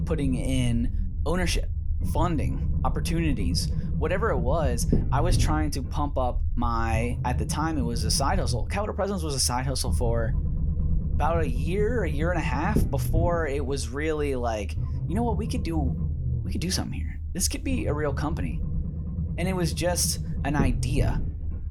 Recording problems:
low rumble; noticeable; throughout; 10 dB below the speech

